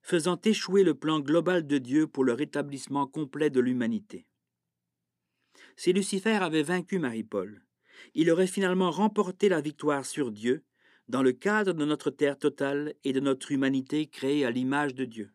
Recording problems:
none

